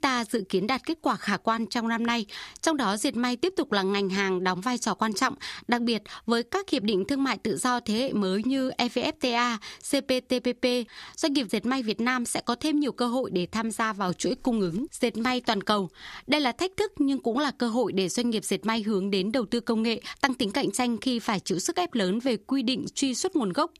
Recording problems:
squashed, flat; somewhat

